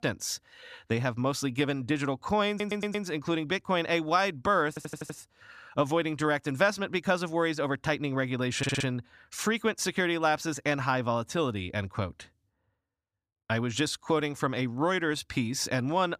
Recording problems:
audio stuttering; at 2.5 s, at 4.5 s and at 8.5 s

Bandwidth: 14.5 kHz